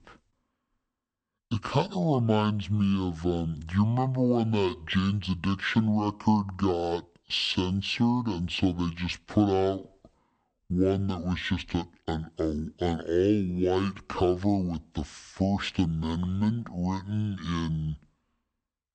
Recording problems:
wrong speed and pitch; too slow and too low; 0.6 times normal speed

